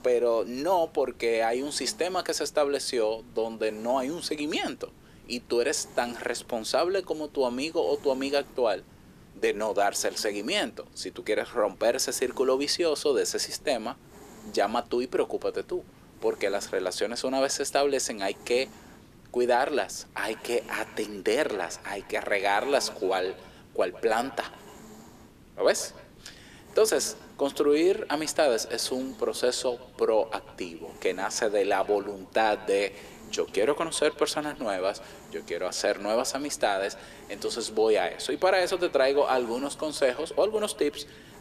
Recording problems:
thin; somewhat; fading below 350 Hz
echo of what is said; faint; from 20 s on; 140 ms later, 20 dB below the speech
hiss; faint; throughout; 25 dB below the speech

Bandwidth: 14.5 kHz